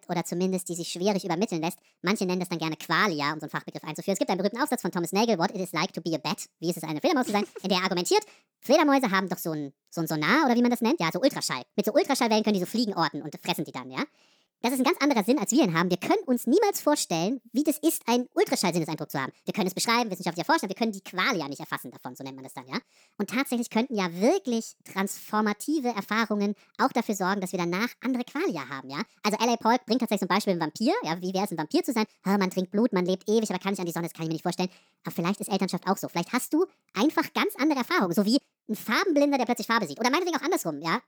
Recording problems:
wrong speed and pitch; too fast and too high; 1.5 times normal speed

